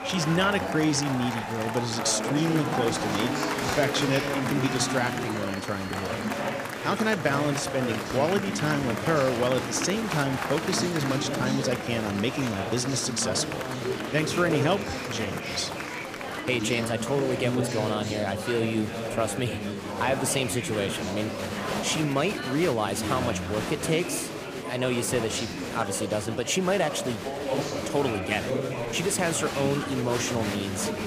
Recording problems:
murmuring crowd; loud; throughout; 3 dB below the speech

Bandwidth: 15 kHz